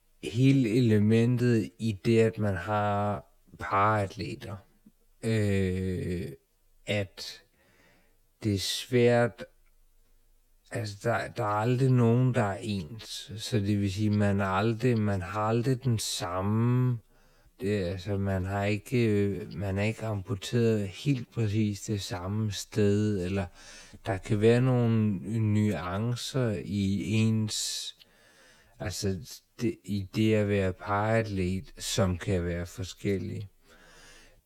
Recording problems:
wrong speed, natural pitch; too slow; 0.5 times normal speed

